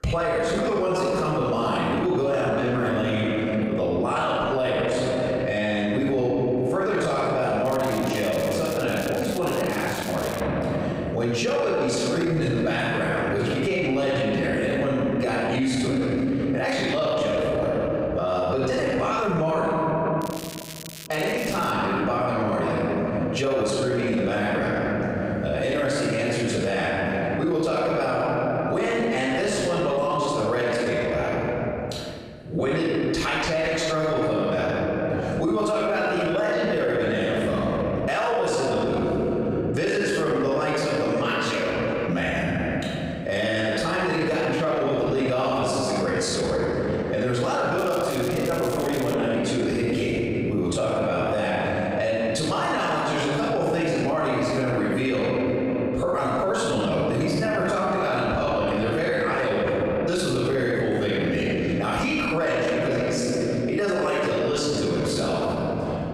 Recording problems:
room echo; strong; dies away in 2.1 s
off-mic speech; far
squashed, flat; heavily
crackling; noticeable; from 7.5 to 10 s, from 20 to 22 s and from 48 to 49 s; 15 dB below the speech

